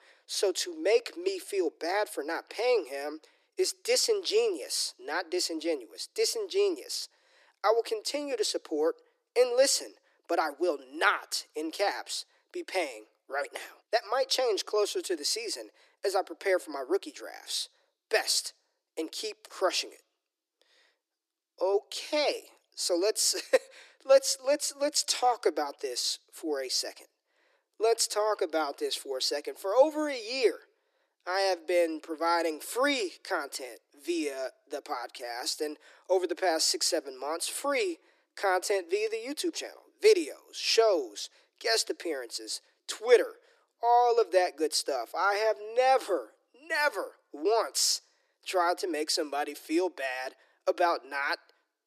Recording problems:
thin; somewhat; fading below 300 Hz

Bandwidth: 14 kHz